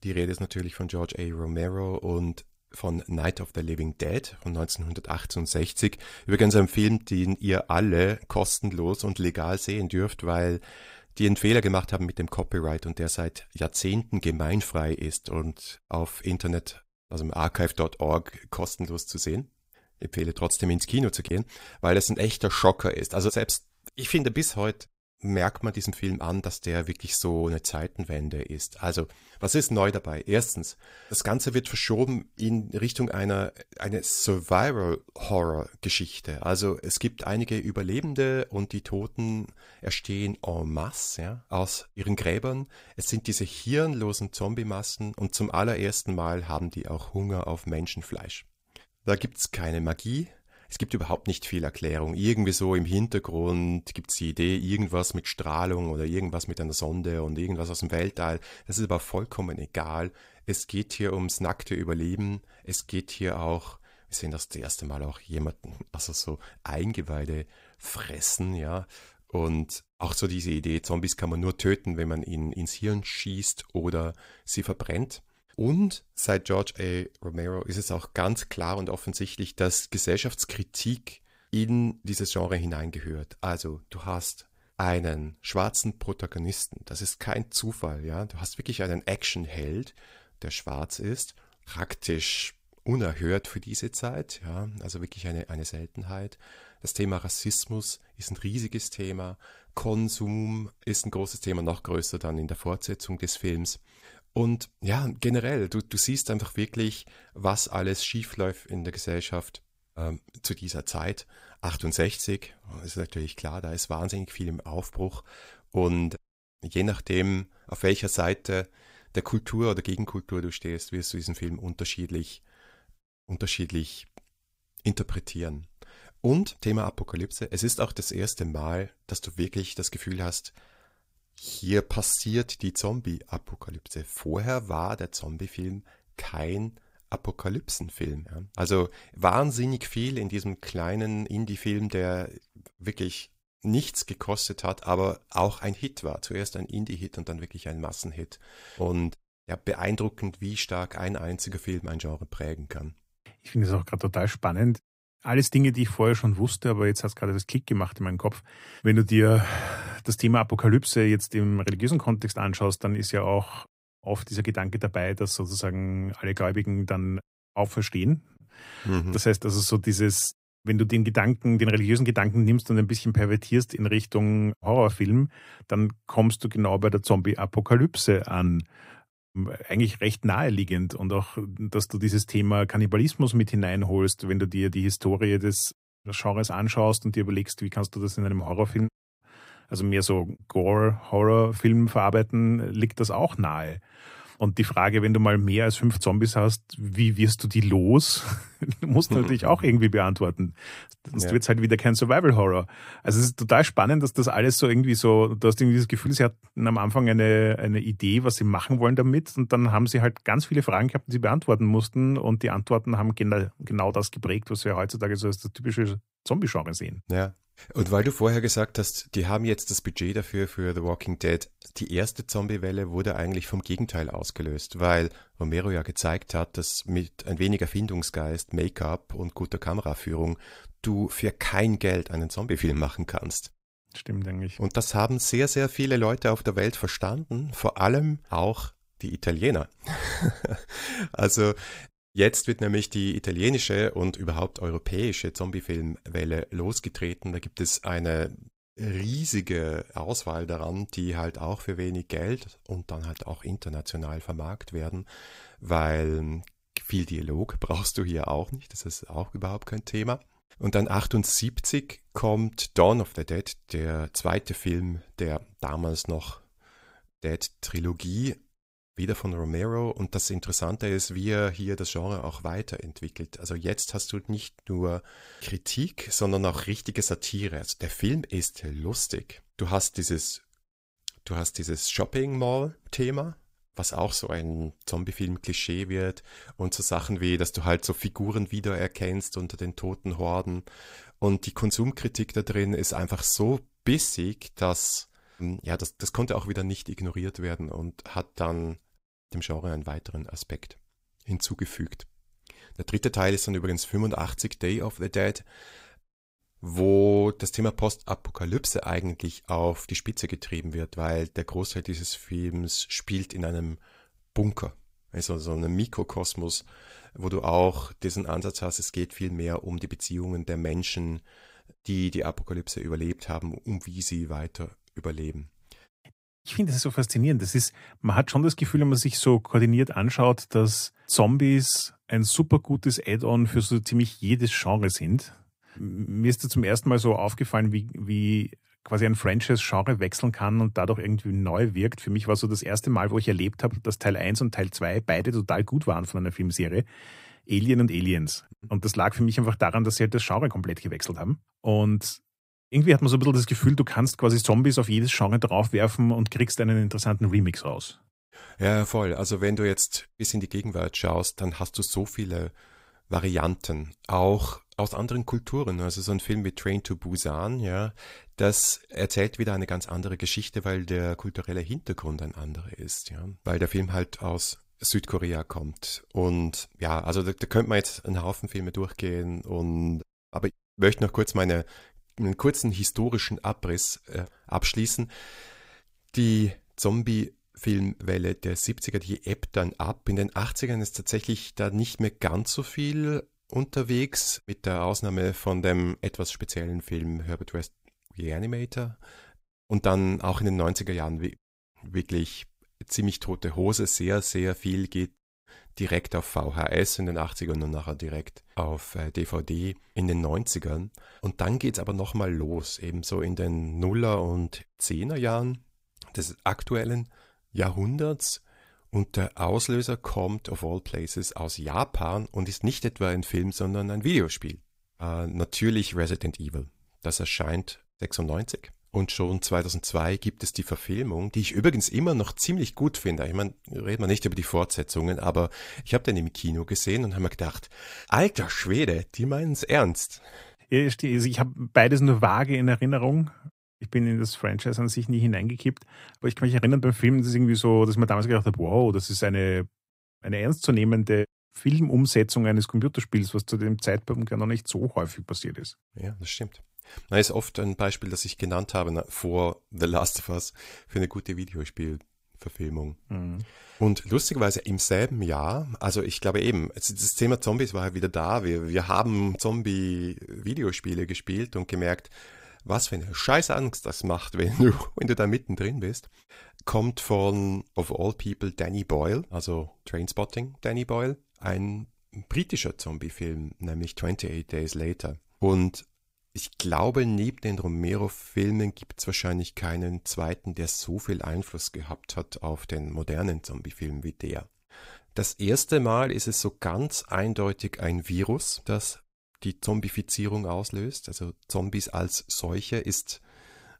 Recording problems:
none

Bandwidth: 15.5 kHz